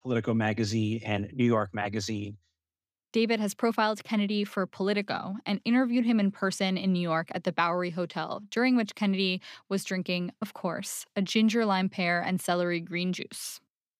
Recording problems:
none

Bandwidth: 15 kHz